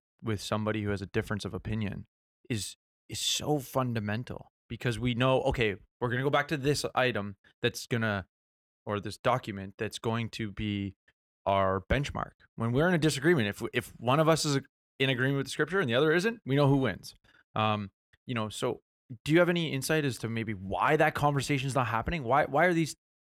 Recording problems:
none

